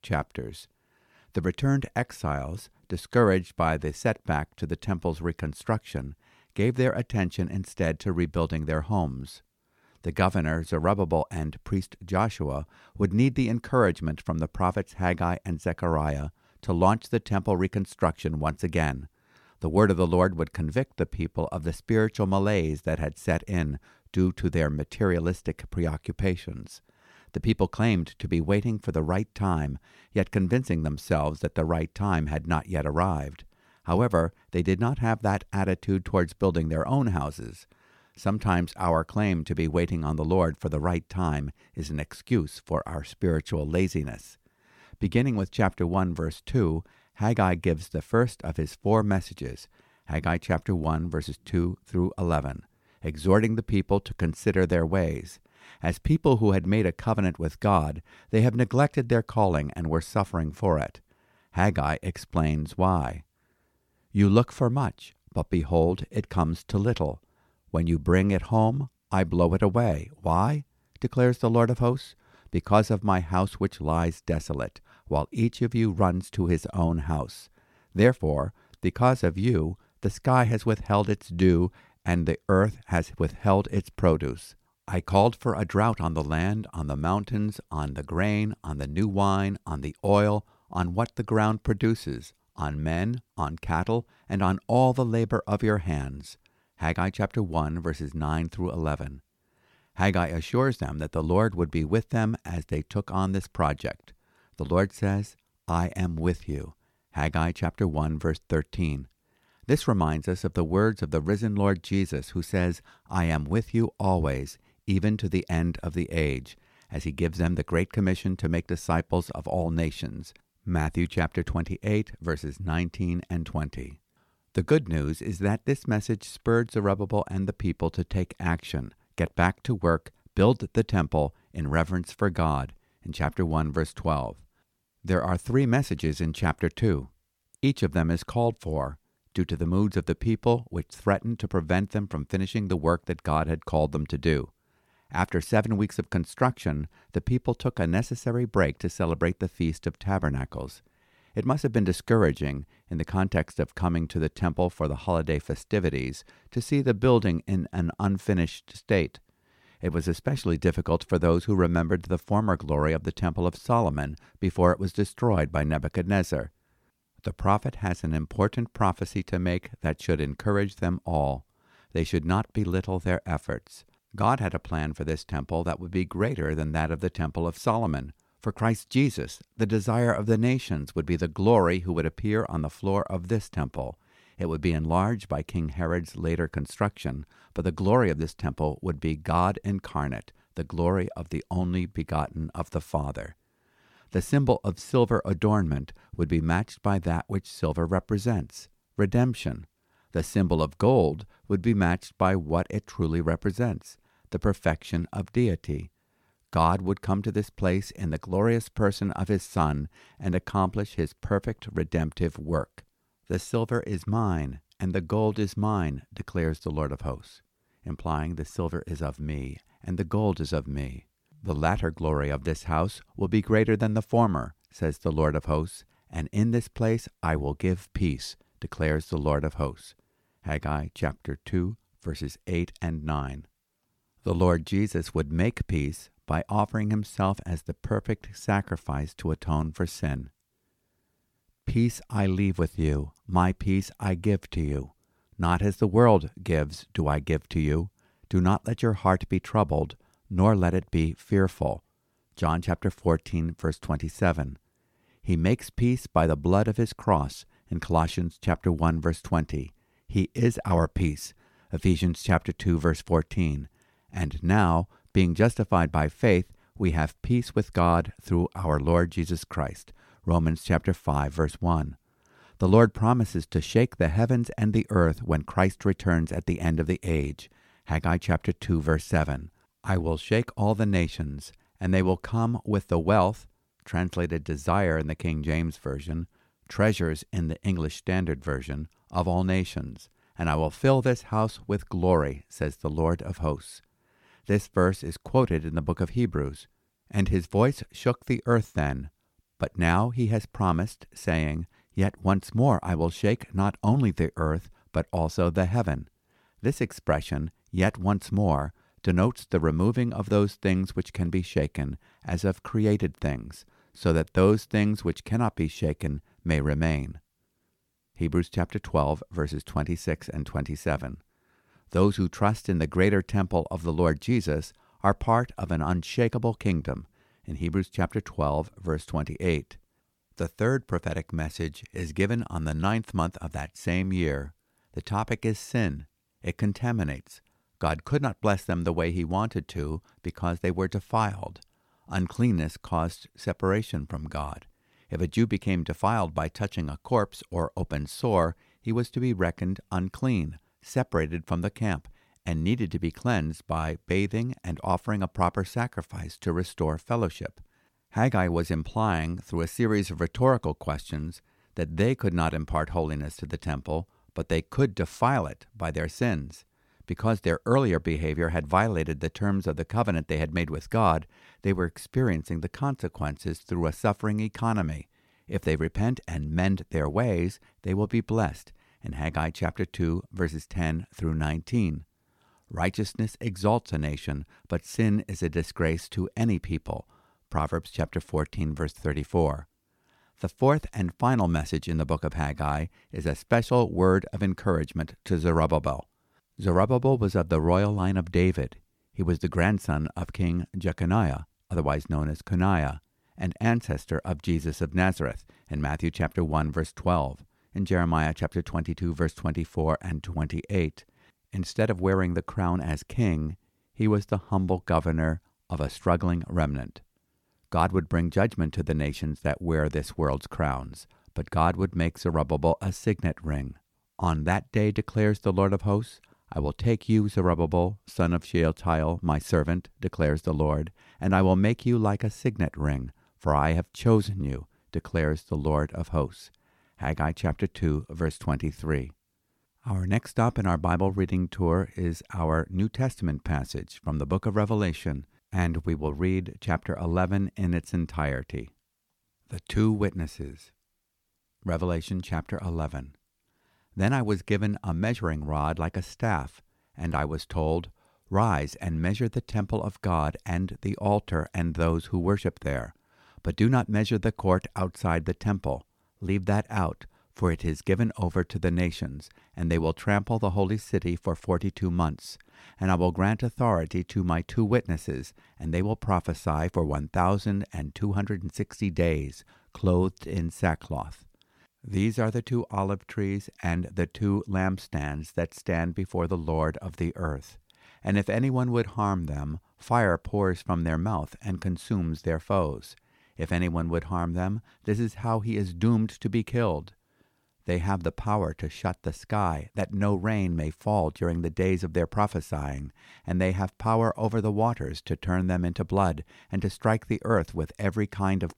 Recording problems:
none

